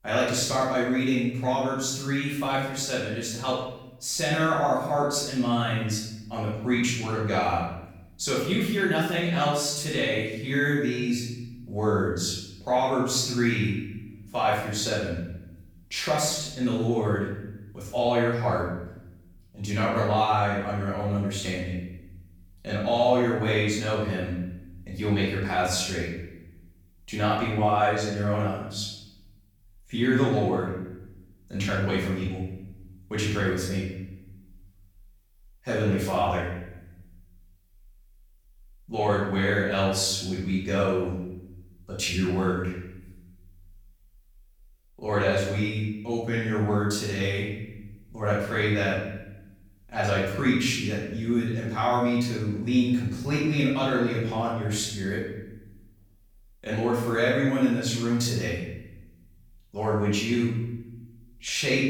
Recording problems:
off-mic speech; far
room echo; noticeable; dies away in 0.8 s

